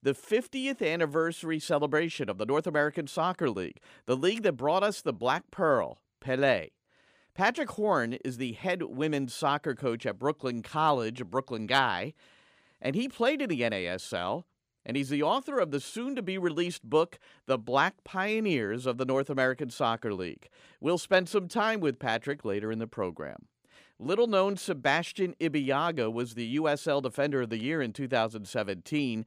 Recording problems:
none

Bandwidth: 15 kHz